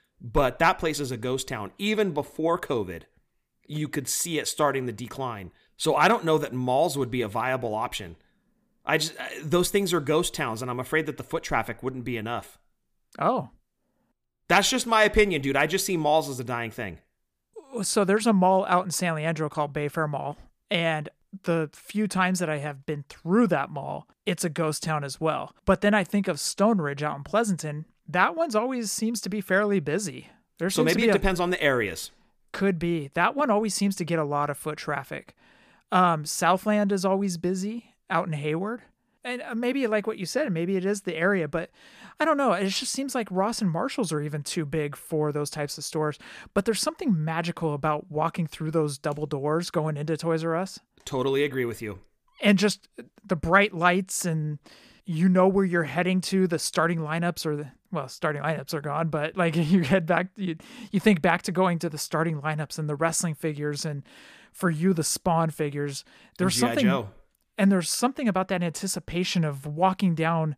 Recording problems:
none

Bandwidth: 15 kHz